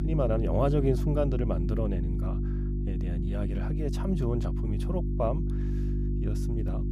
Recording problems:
electrical hum; loud; throughout; 50 Hz, 8 dB below the speech

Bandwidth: 15.5 kHz